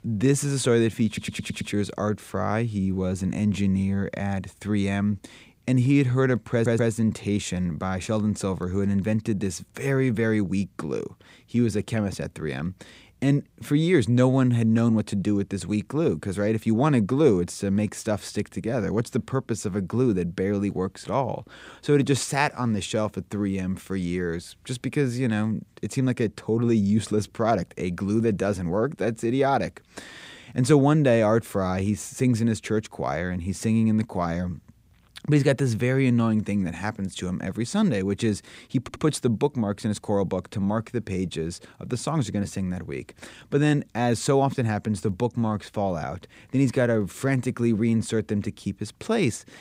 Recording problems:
audio stuttering; at 1 s, at 6.5 s and at 39 s

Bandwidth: 15.5 kHz